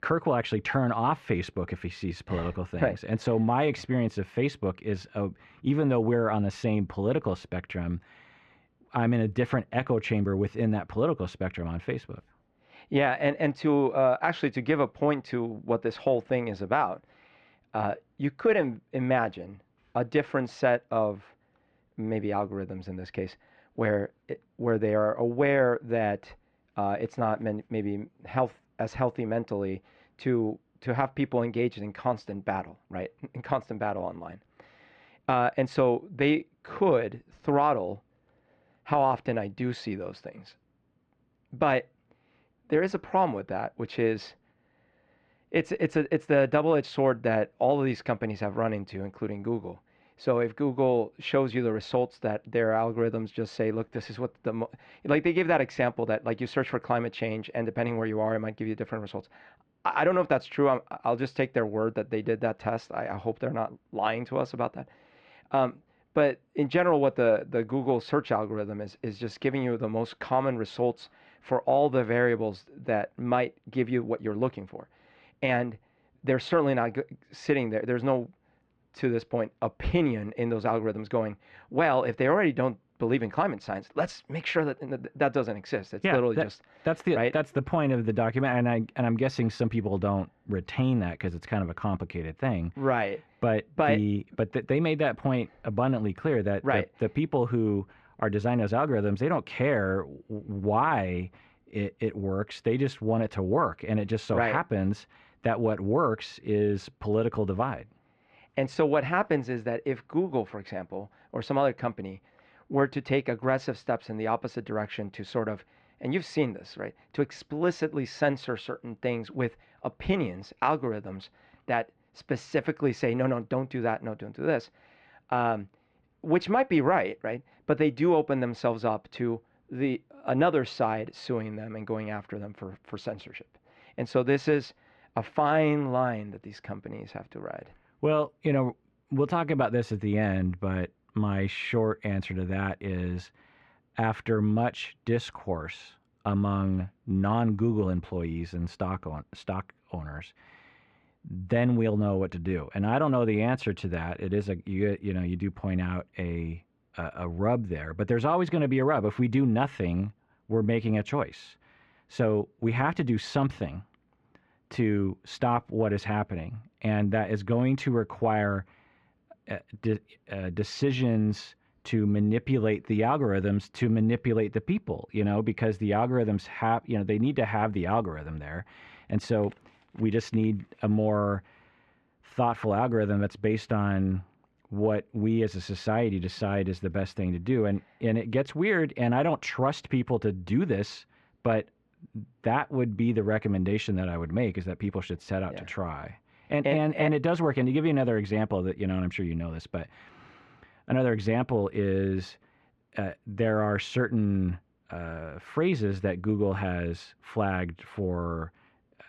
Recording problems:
muffled; slightly; fading above 2.5 kHz

